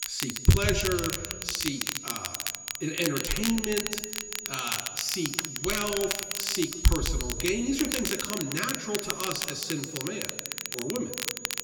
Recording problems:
off-mic speech; far
room echo; noticeable; dies away in 1.5 s
high-pitched whine; loud; throughout; 7 kHz, 9 dB below the speech
crackle, like an old record; loud; 2 dB below the speech

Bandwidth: 17.5 kHz